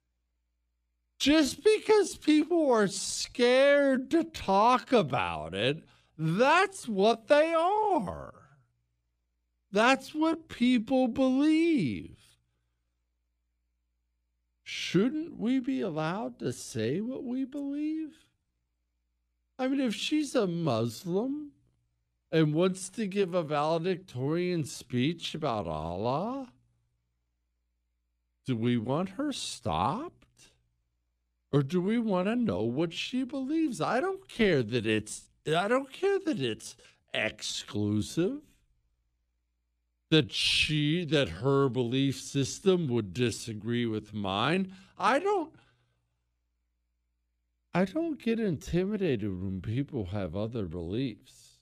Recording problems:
wrong speed, natural pitch; too slow; 0.6 times normal speed

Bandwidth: 15 kHz